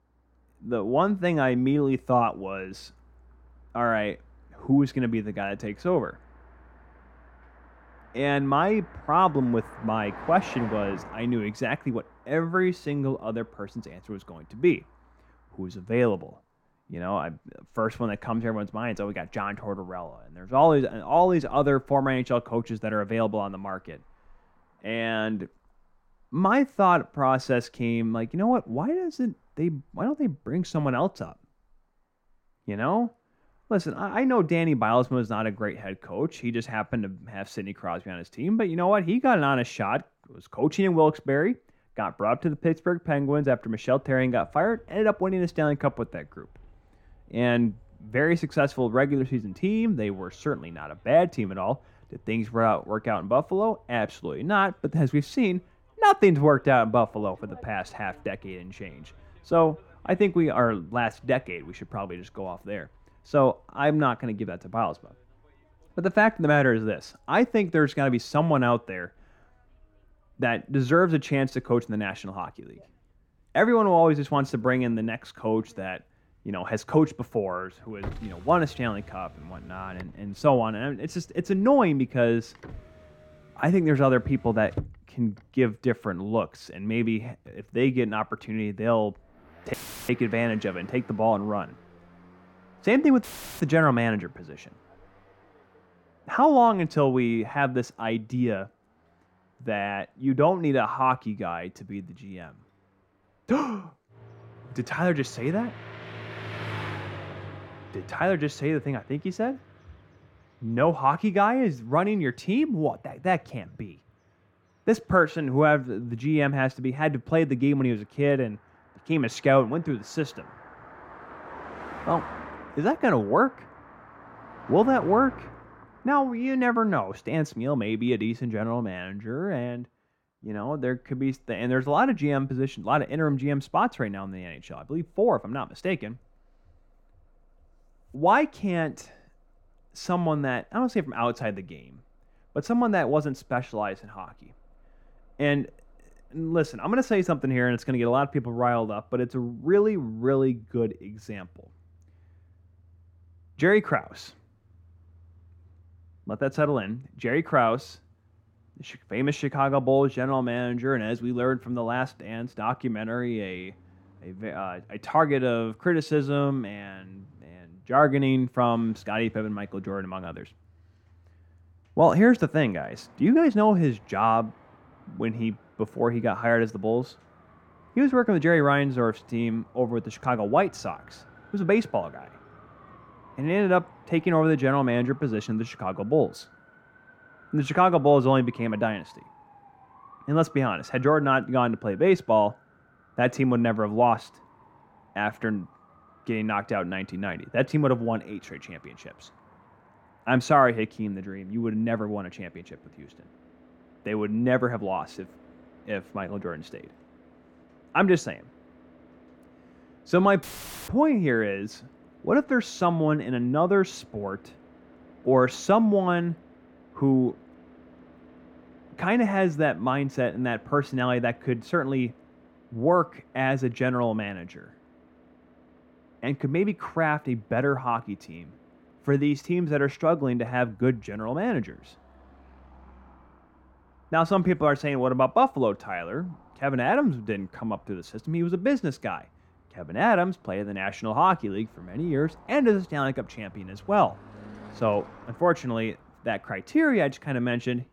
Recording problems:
muffled; slightly; fading above 3 kHz
traffic noise; faint; throughout; 25 dB below the speech
audio cutting out; filled with static; at 1:30, at 1:33 and at 3:30

